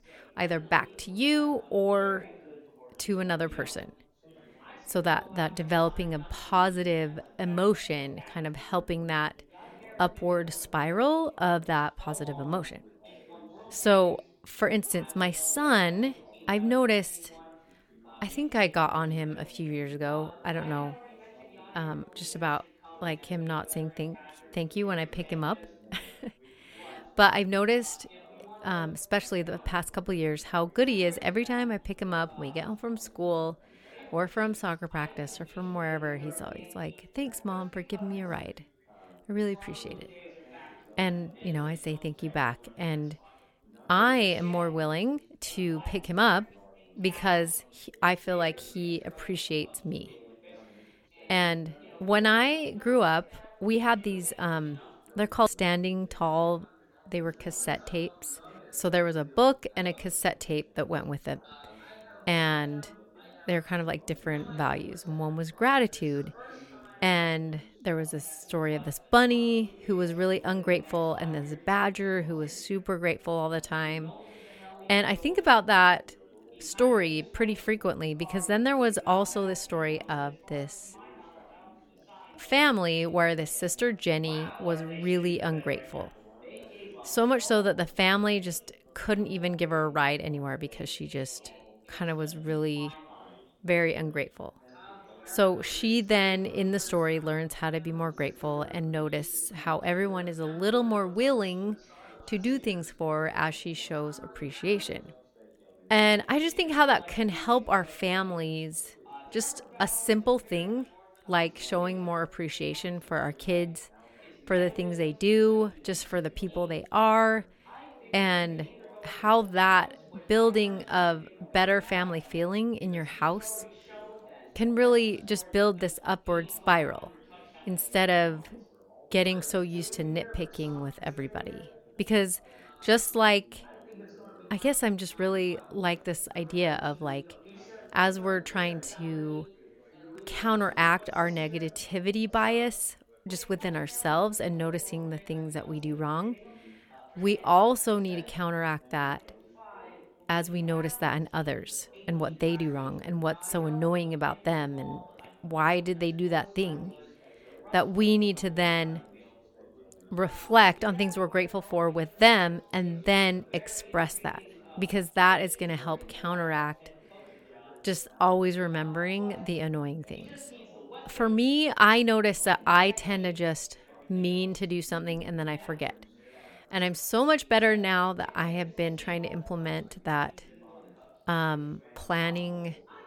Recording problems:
background chatter; faint; throughout; 3 voices, 25 dB below the speech

